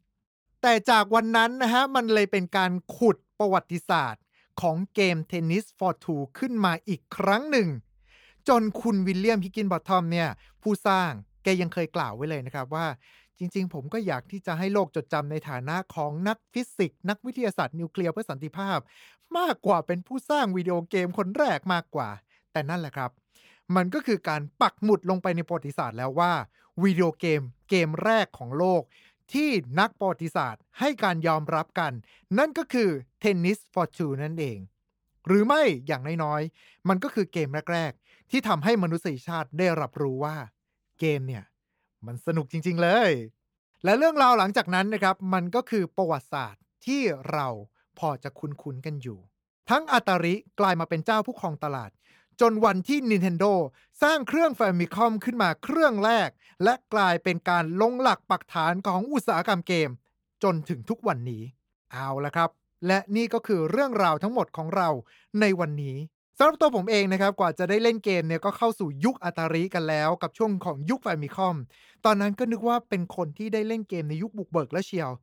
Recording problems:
uneven, jittery; strongly; from 18 s to 1:13

